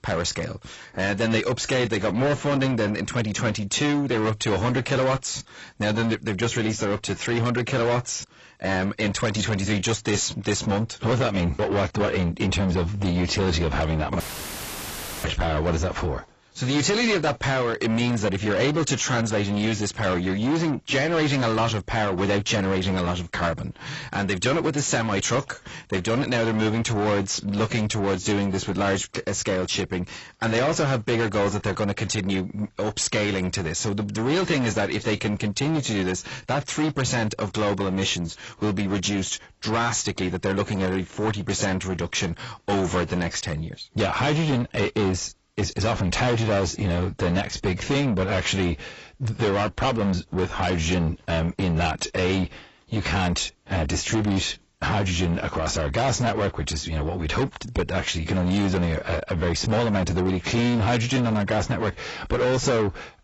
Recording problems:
distortion; heavy; 7 dB below the speech
garbled, watery; badly; nothing above 8 kHz
audio cutting out; filled with static; at 14 s for 1 s

